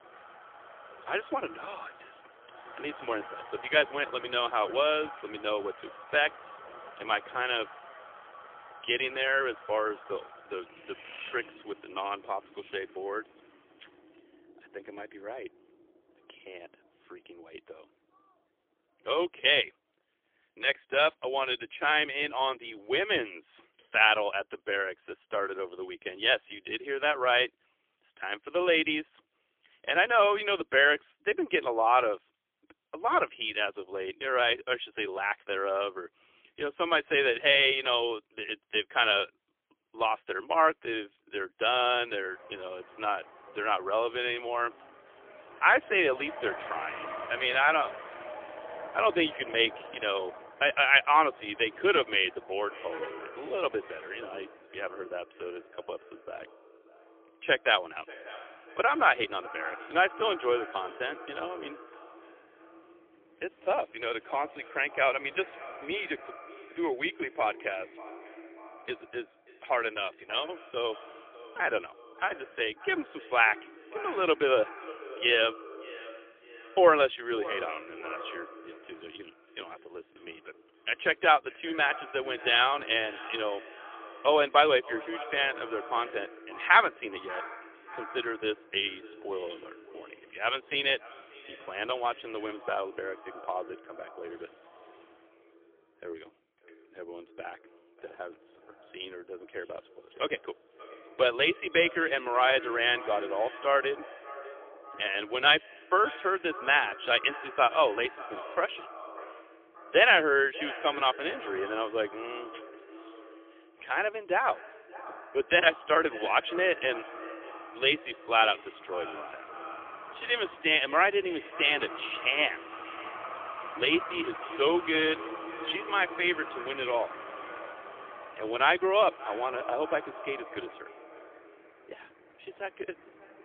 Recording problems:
phone-call audio; poor line; nothing above 3.5 kHz
echo of what is said; noticeable; from 53 s on; 590 ms later, 15 dB below the speech
traffic noise; noticeable; throughout; 20 dB below the speech

